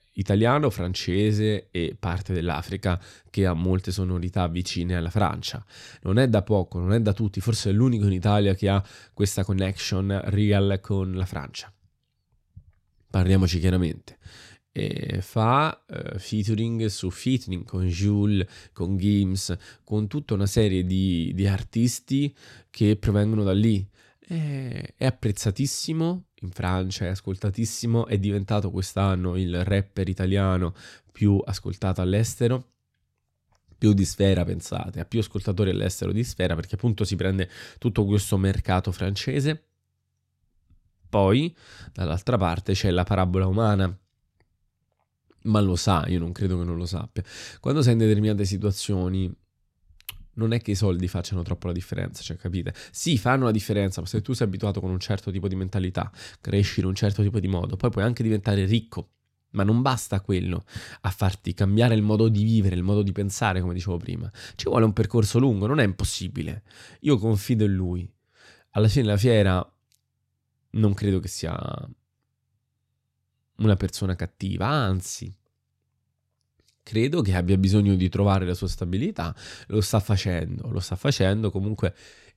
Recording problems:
none

